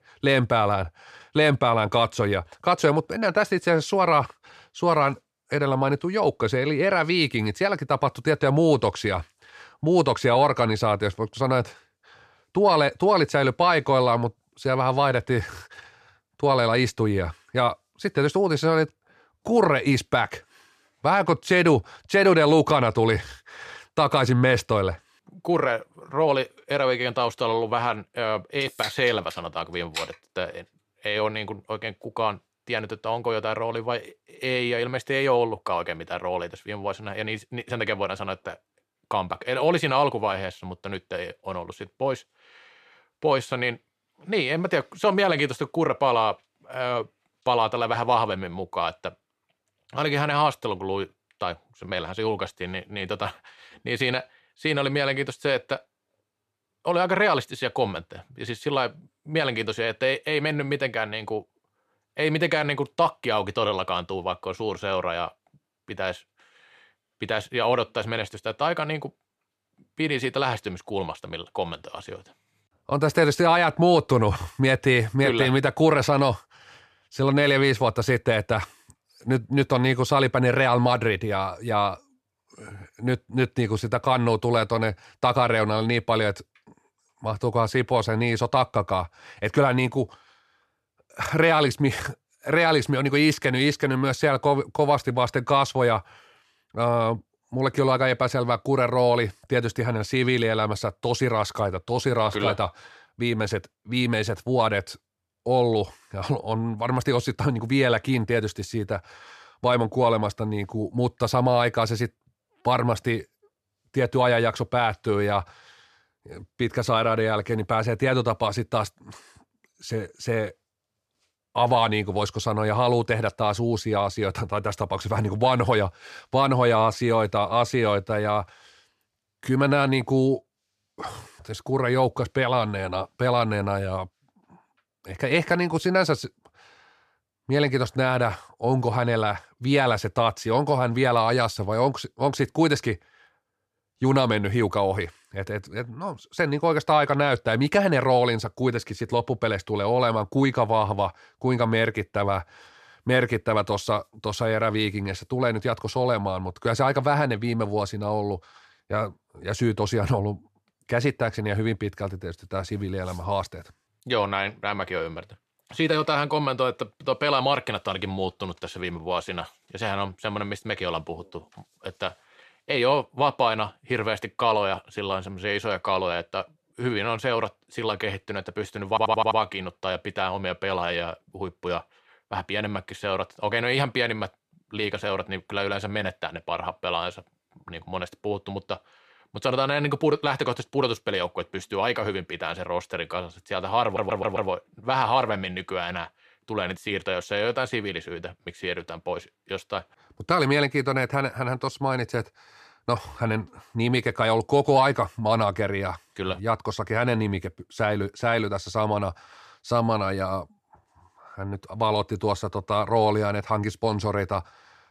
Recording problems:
audio stuttering; at 2:59 and at 3:14

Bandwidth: 14.5 kHz